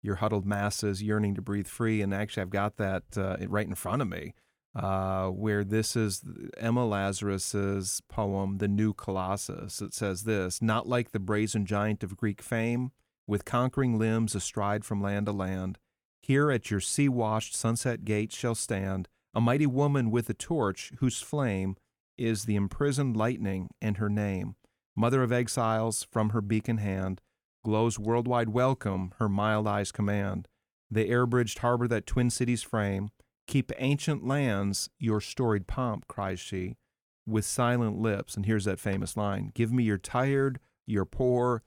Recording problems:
none

